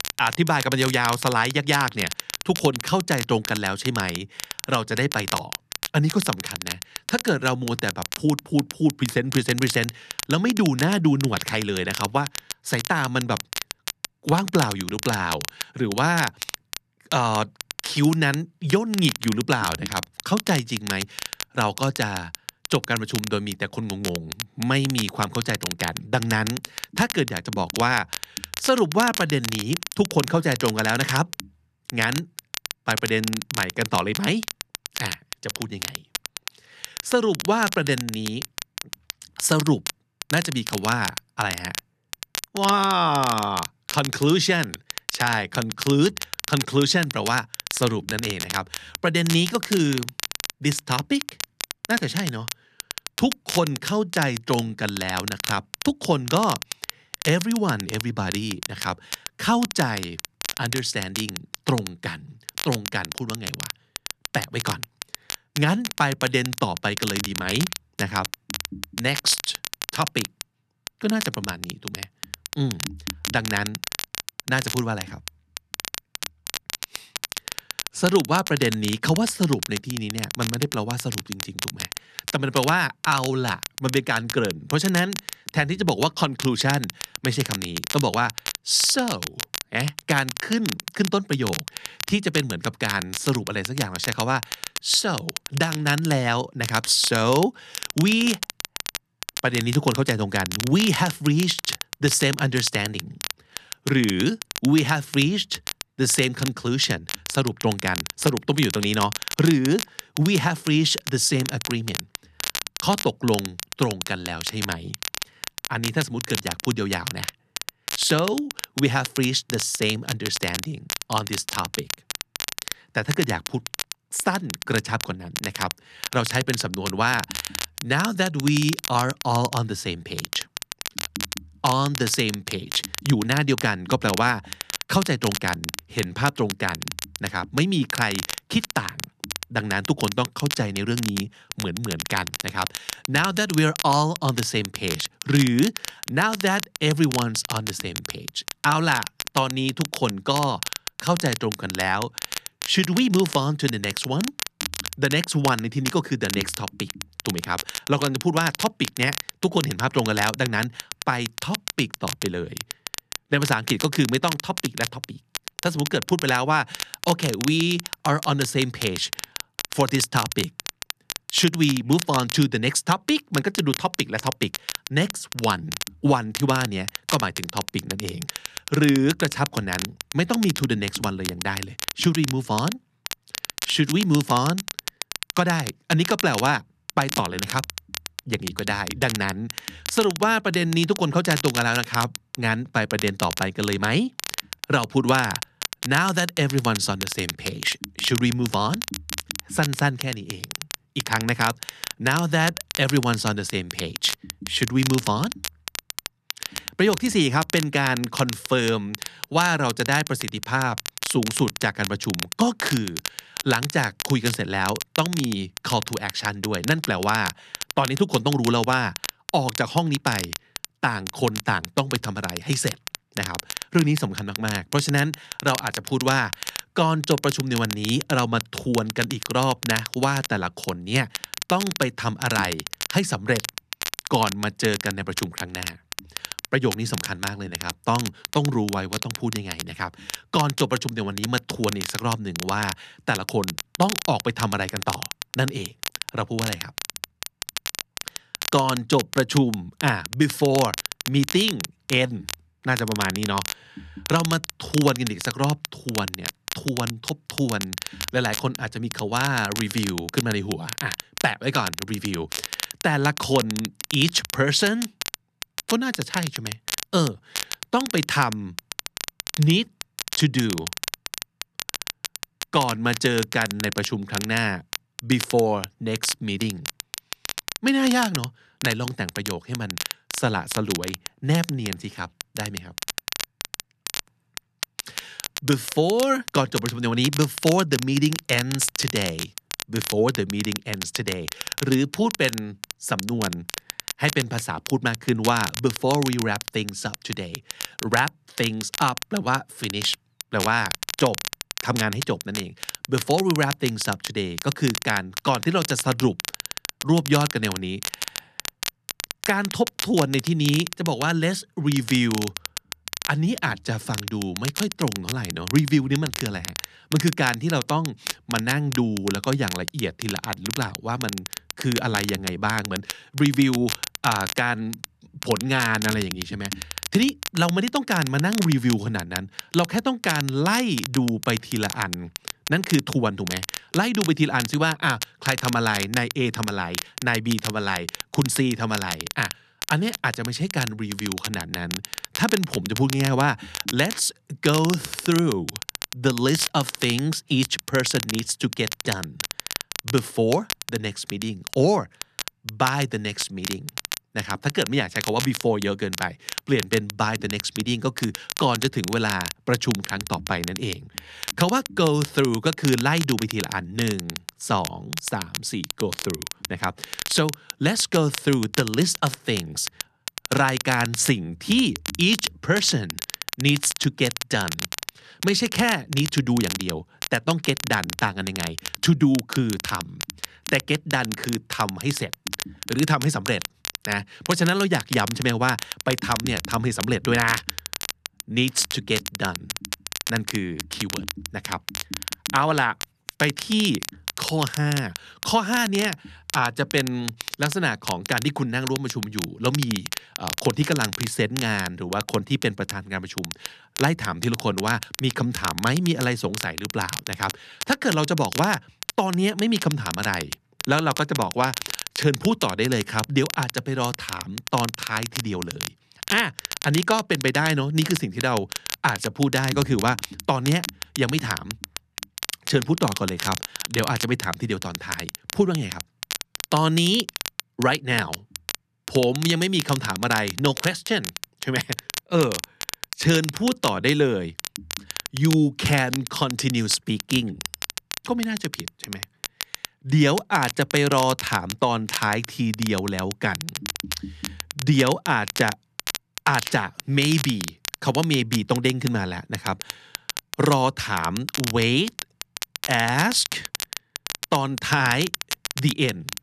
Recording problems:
crackle, like an old record; loud; 8 dB below the speech

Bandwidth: 13.5 kHz